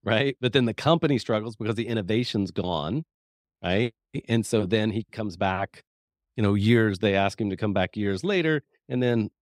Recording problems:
none

